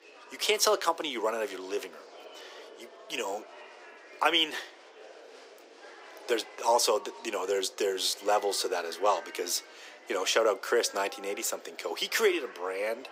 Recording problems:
thin; very; fading below 350 Hz
murmuring crowd; noticeable; throughout; 20 dB below the speech

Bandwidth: 15.5 kHz